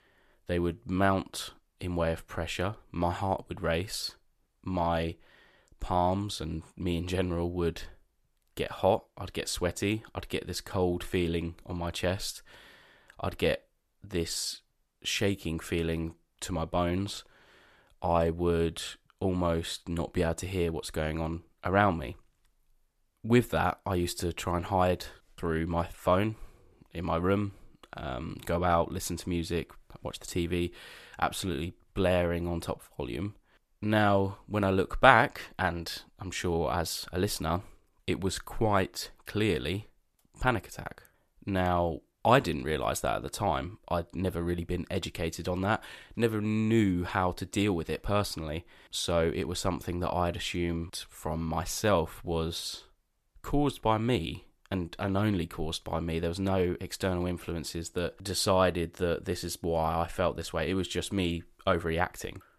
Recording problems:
none

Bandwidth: 14 kHz